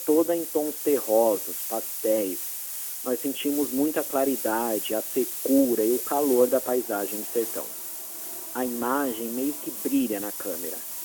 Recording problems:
phone-call audio
hiss; loud; throughout; 4 dB below the speech
traffic noise; faint; throughout; 25 dB below the speech

